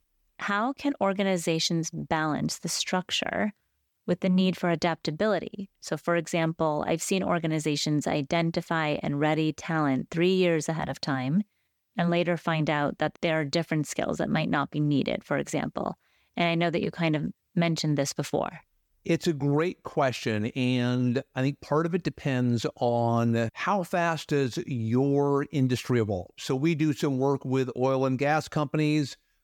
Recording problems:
none

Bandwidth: 18 kHz